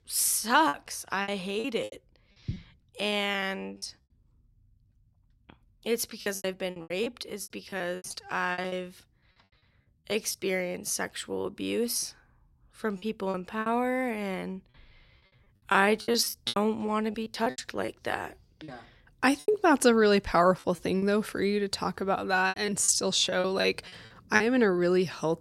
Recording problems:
choppy; very; 12% of the speech affected

